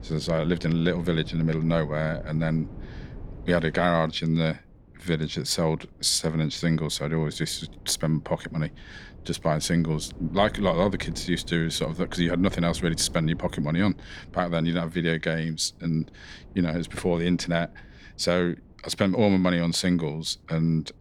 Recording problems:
wind noise on the microphone; occasional gusts; 25 dB below the speech

